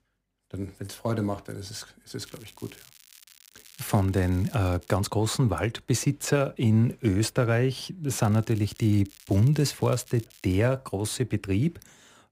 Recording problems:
crackling; faint; from 2 to 5 s and from 8 to 11 s; 25 dB below the speech

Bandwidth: 15.5 kHz